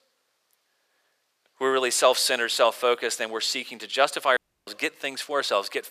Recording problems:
thin; somewhat; fading below 550 Hz
audio cutting out; at 4.5 s

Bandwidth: 14.5 kHz